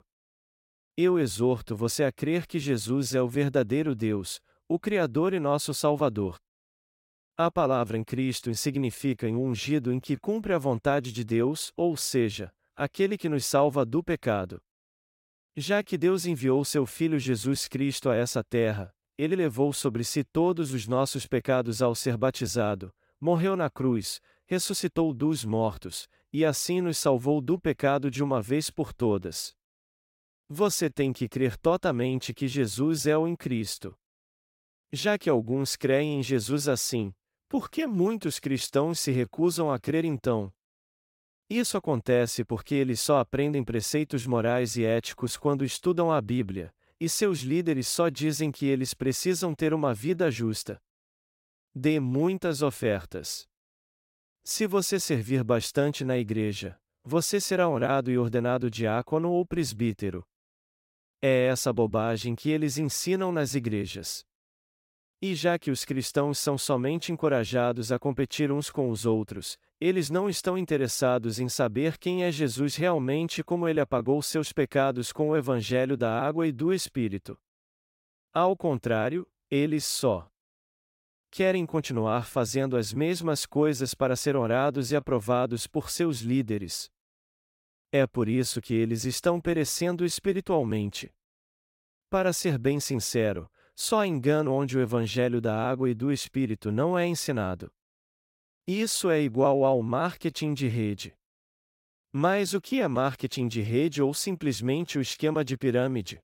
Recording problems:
none

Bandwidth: 16 kHz